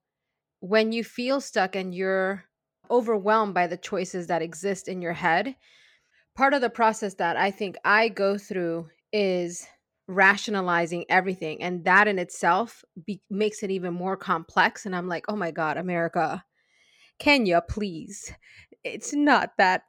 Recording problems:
none

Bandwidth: 17 kHz